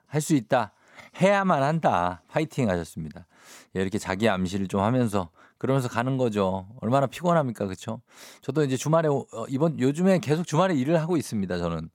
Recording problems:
none

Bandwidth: 17 kHz